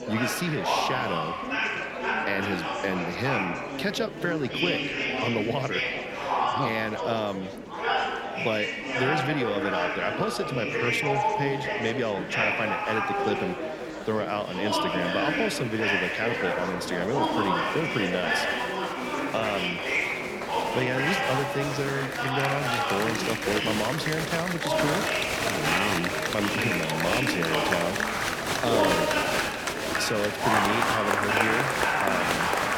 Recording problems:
murmuring crowd; very loud; throughout; 3 dB above the speech

